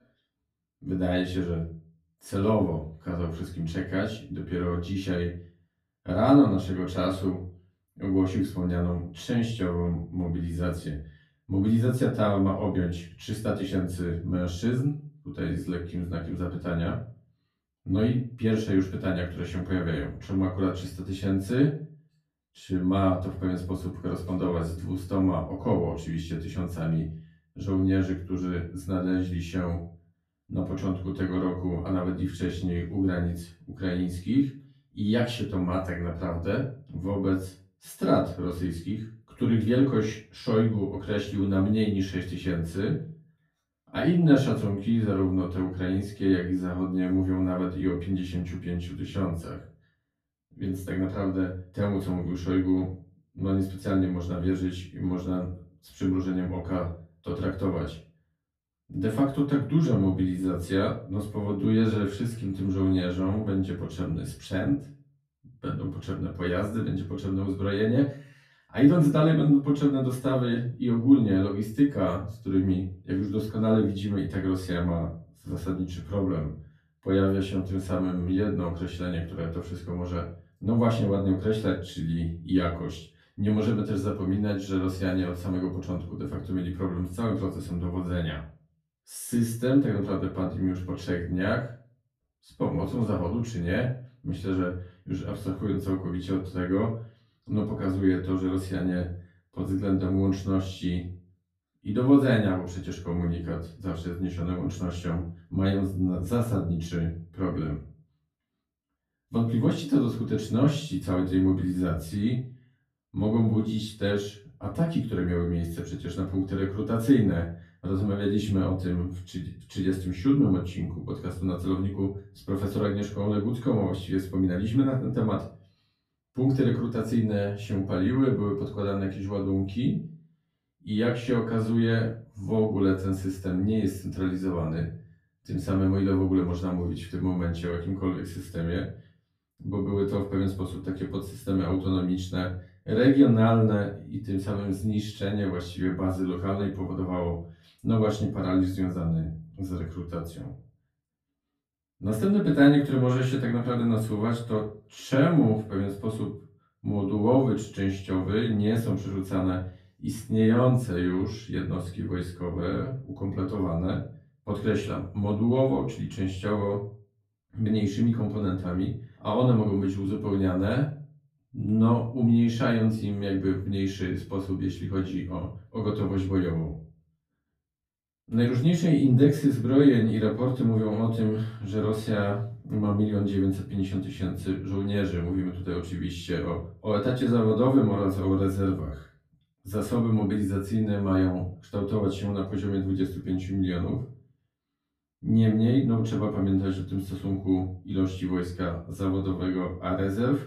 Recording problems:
off-mic speech; far
room echo; slight; dies away in 0.3 s

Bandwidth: 14.5 kHz